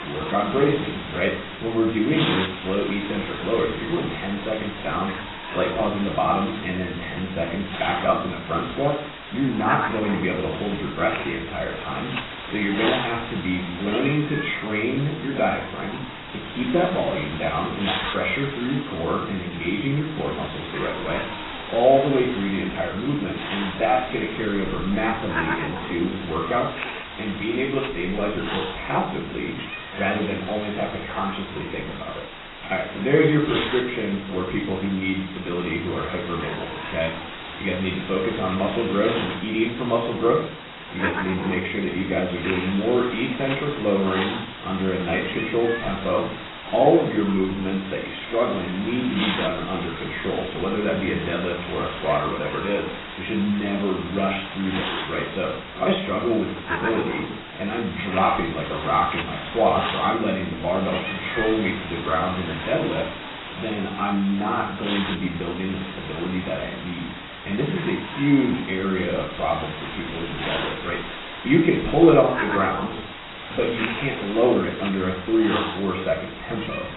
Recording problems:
off-mic speech; far
garbled, watery; badly; nothing above 4 kHz
room echo; slight; dies away in 0.4 s
hiss; loud; throughout; 8 dB below the speech
crackling; very faint; 4 times, first at 18 s; 30 dB below the speech

